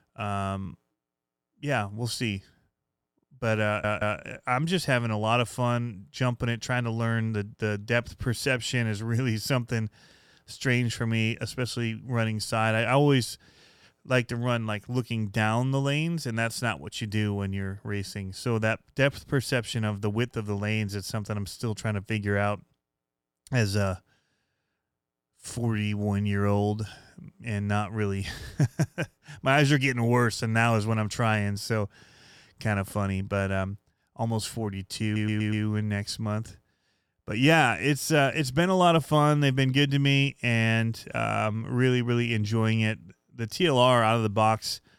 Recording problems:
audio stuttering; at 3.5 s and at 35 s

